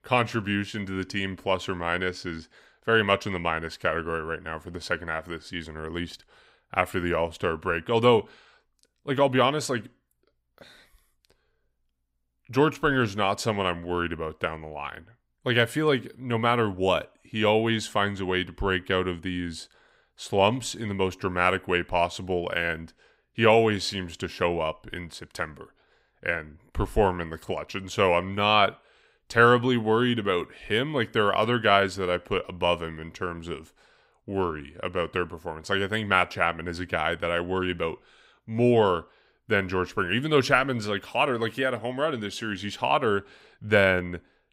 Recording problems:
none

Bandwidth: 15.5 kHz